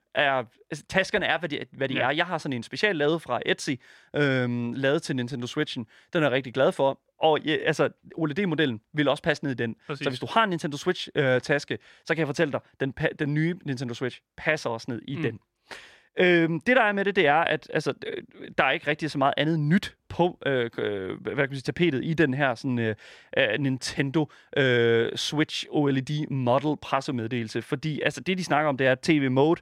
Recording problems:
none

